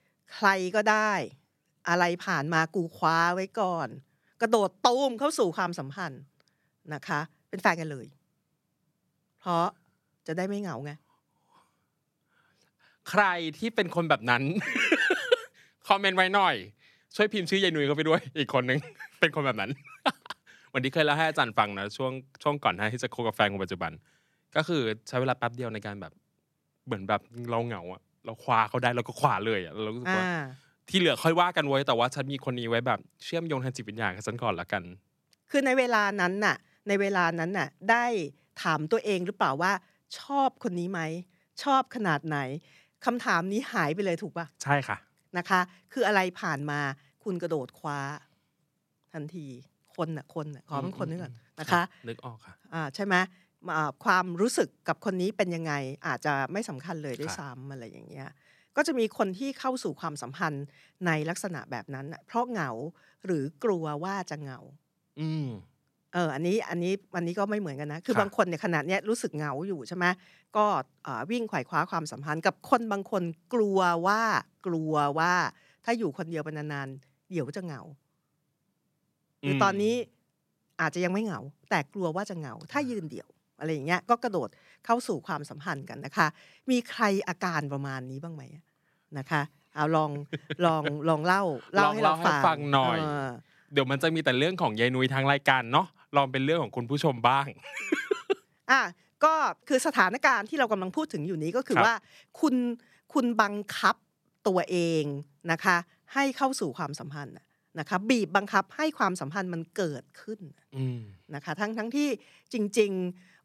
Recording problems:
none

